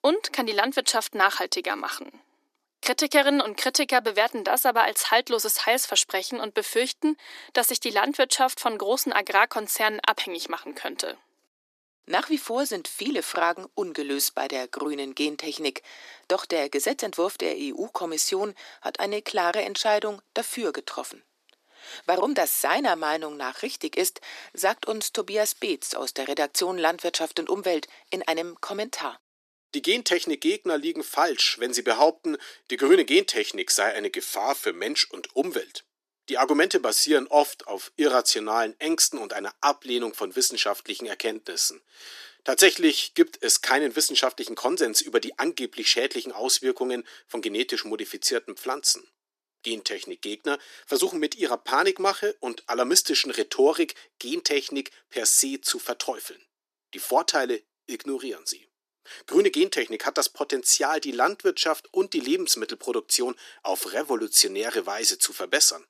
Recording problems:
thin; somewhat; fading below 300 Hz

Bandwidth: 14.5 kHz